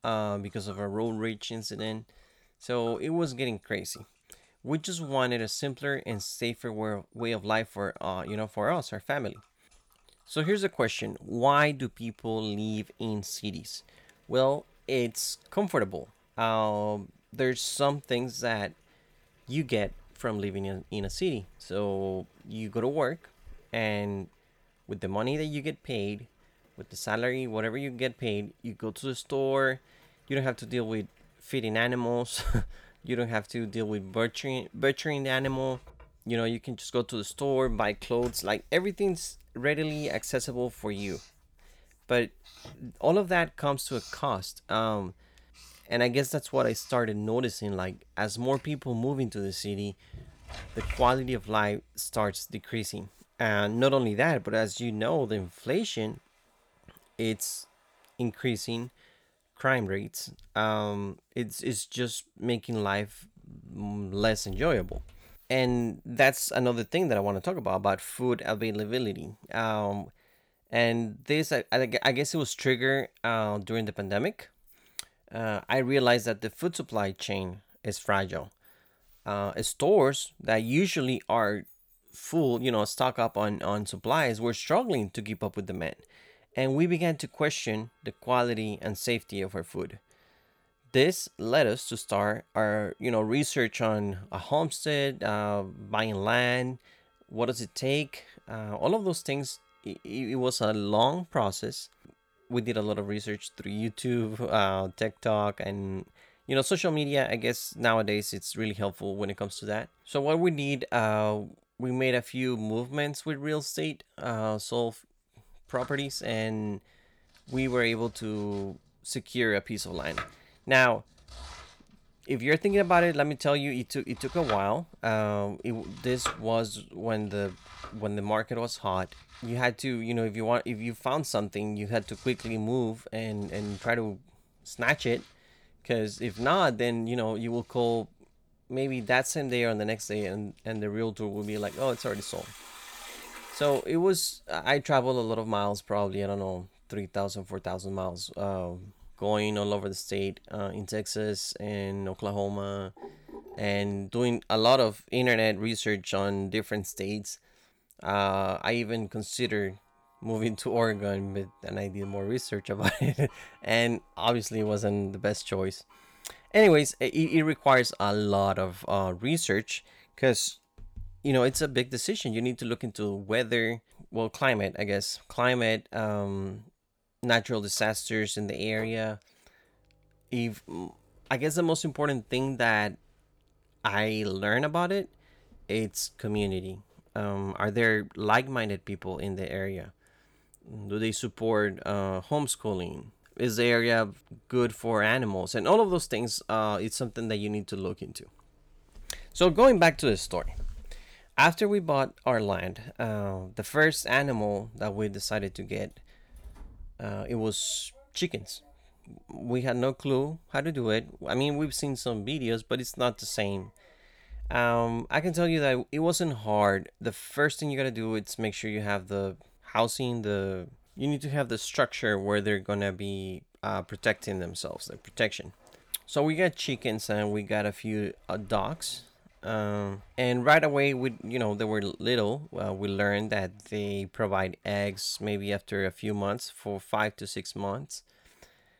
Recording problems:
household noises; faint; throughout; 20 dB below the speech

